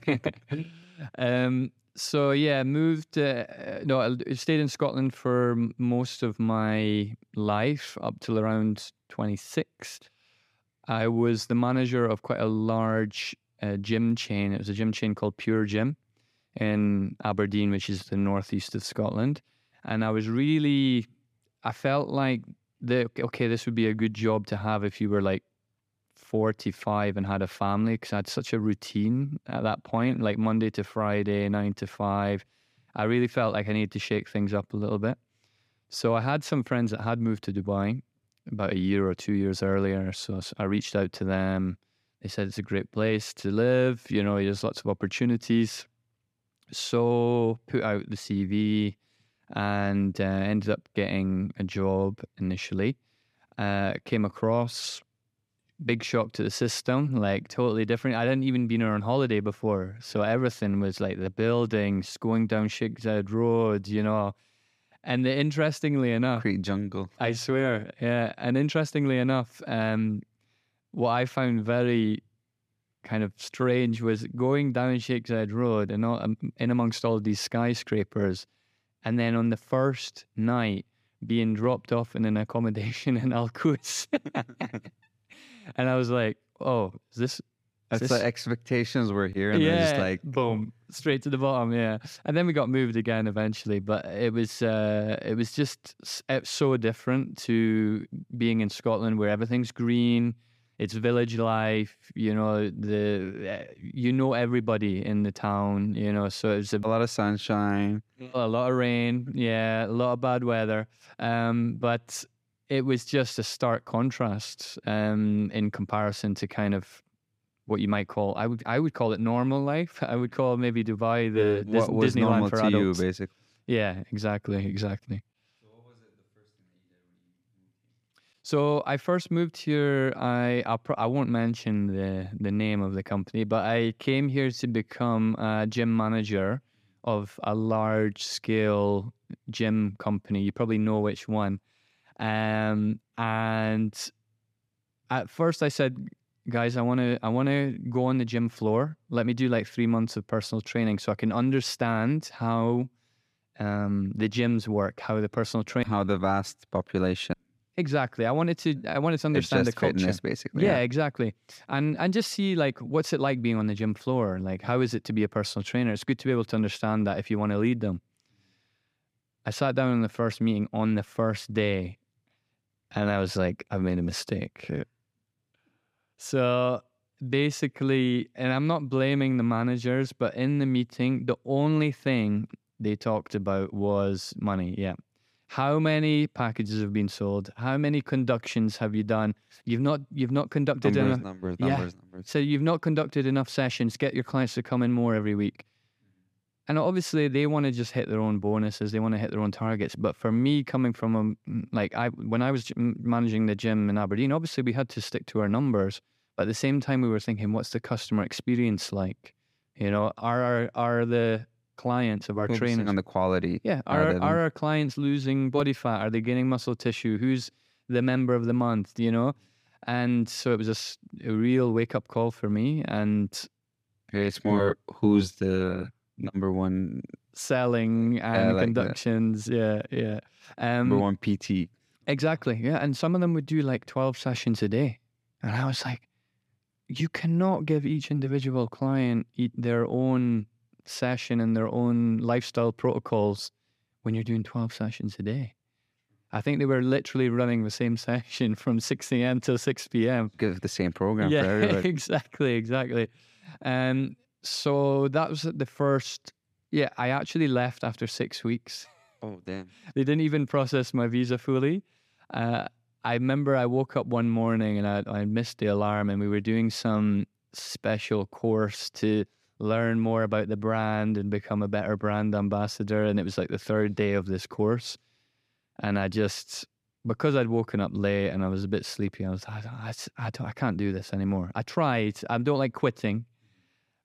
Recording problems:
none

